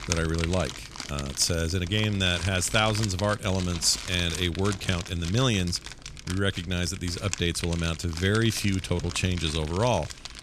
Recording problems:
household noises; noticeable; throughout; 10 dB below the speech

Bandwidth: 14.5 kHz